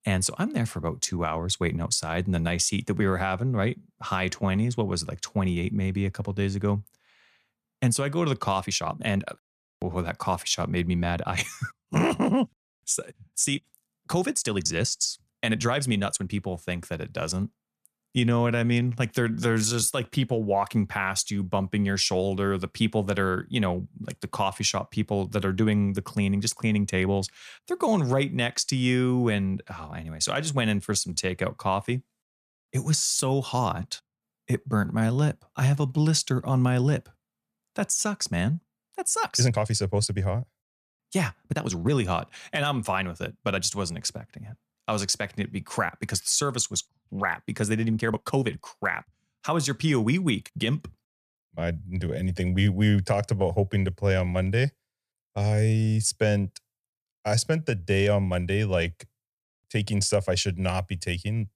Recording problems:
uneven, jittery; strongly; from 1 to 58 s

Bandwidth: 14.5 kHz